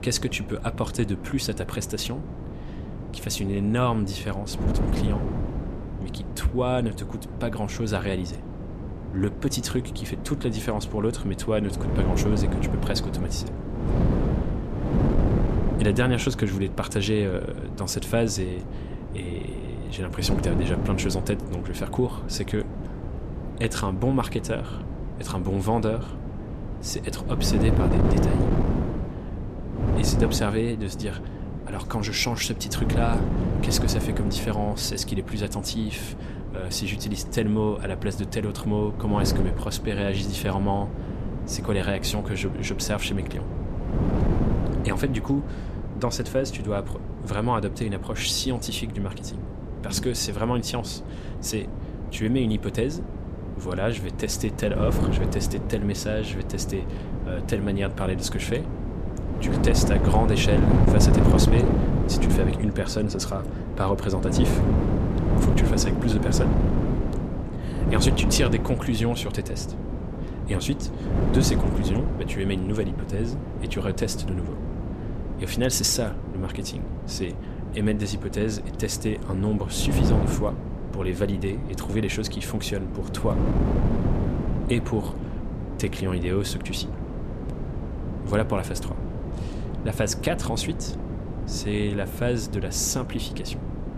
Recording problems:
wind noise on the microphone; heavy; 5 dB below the speech

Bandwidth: 14.5 kHz